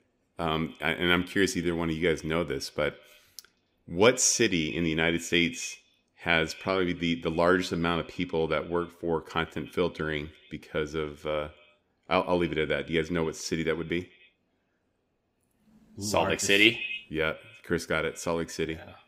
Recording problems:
echo of what is said; noticeable; throughout; 90 ms later, 20 dB below the speech

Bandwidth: 15.5 kHz